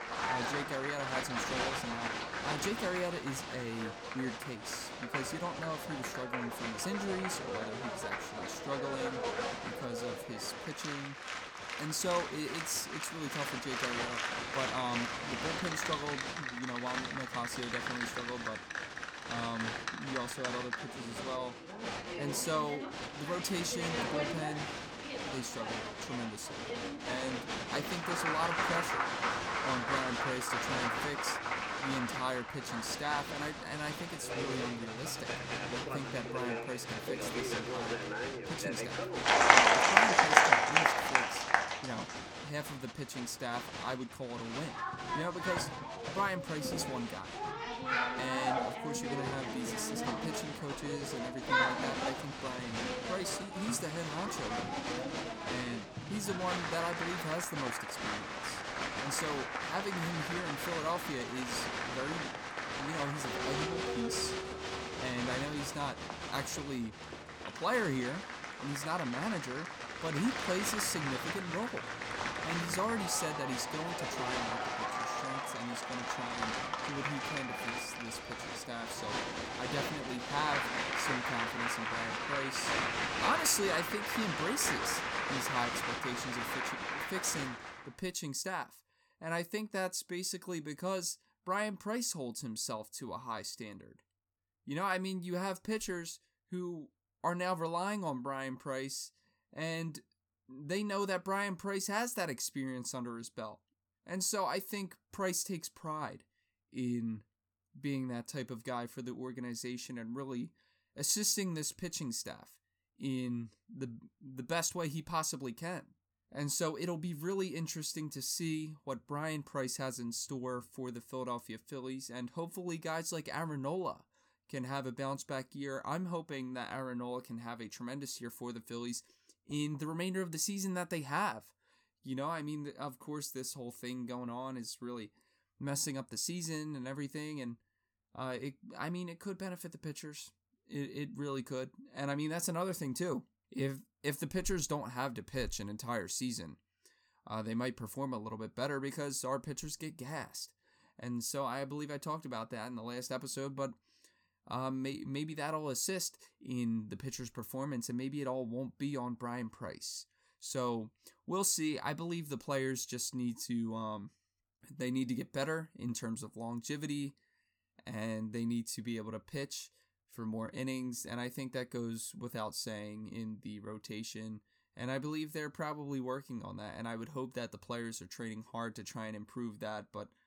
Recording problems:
crowd noise; very loud; until 1:28; 3 dB above the speech

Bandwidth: 17.5 kHz